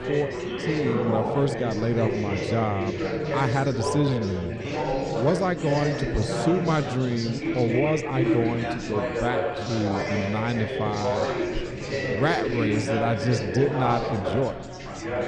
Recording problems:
chatter from many people; loud; throughout; 1 dB below the speech
uneven, jittery; strongly; from 1.5 to 15 s

